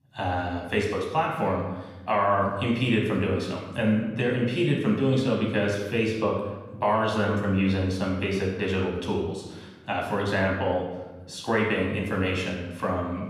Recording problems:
room echo; noticeable; dies away in 1 s
off-mic speech; somewhat distant

